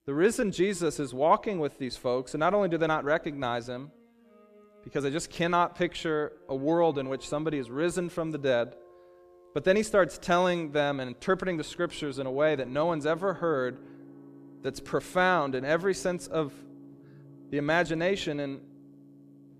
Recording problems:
background music; faint; throughout; 25 dB below the speech

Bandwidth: 14.5 kHz